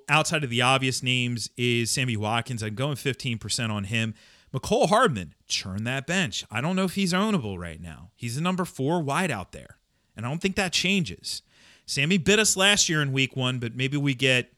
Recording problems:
none

